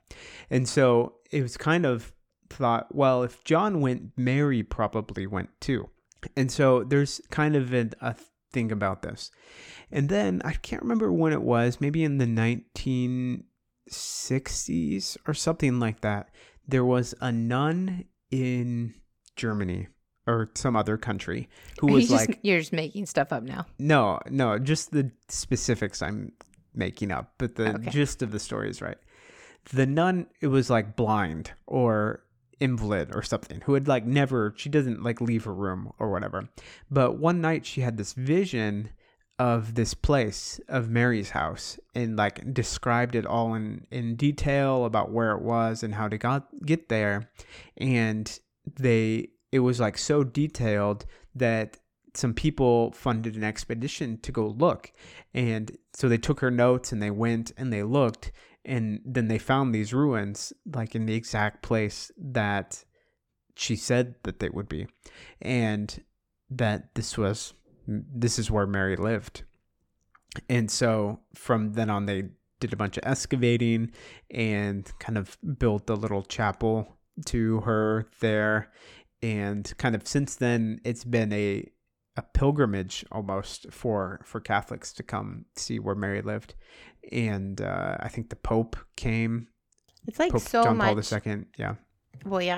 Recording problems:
abrupt cut into speech; at the end

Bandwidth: 18 kHz